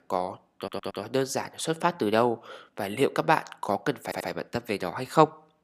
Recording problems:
audio stuttering; at 0.5 s and at 4 s

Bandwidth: 15 kHz